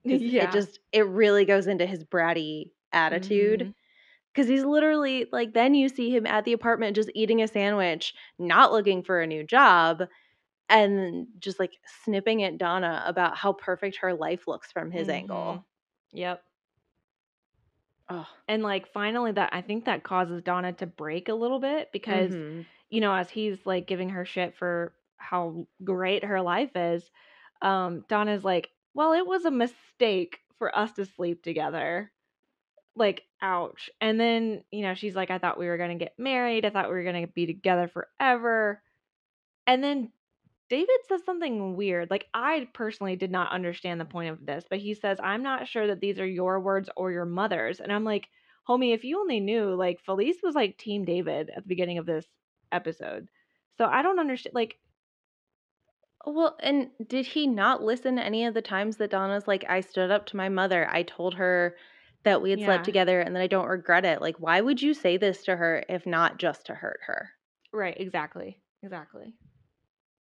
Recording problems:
muffled; slightly; fading above 2.5 kHz

